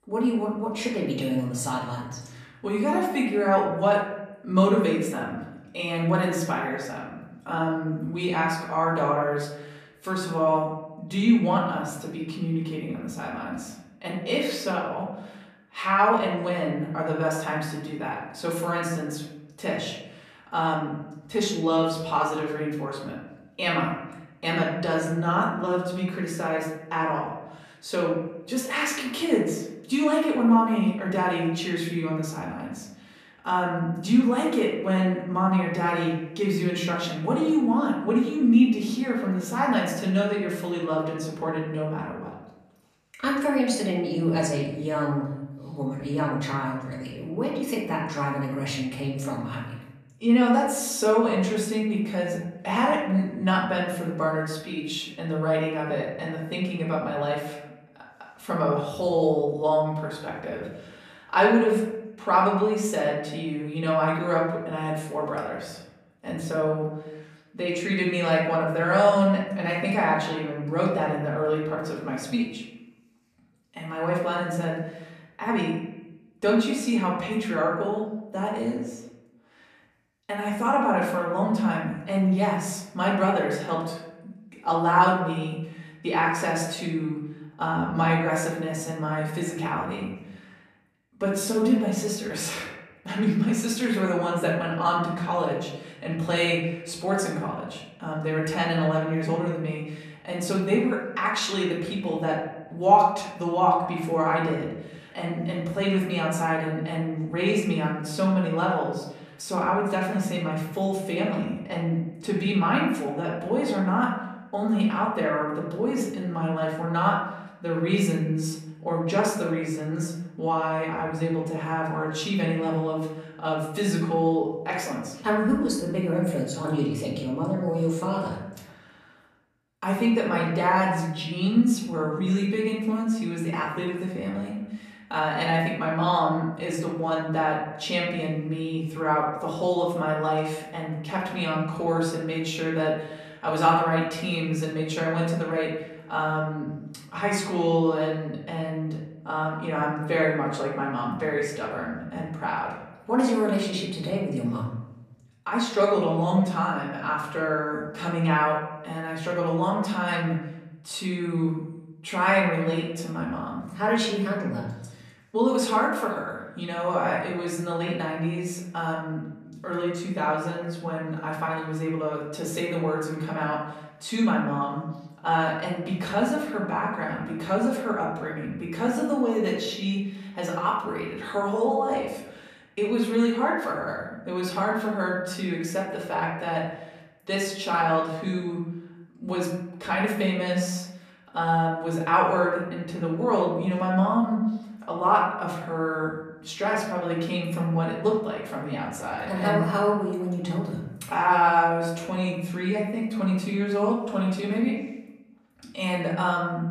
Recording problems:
off-mic speech; far
room echo; noticeable; dies away in 0.8 s

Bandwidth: 14.5 kHz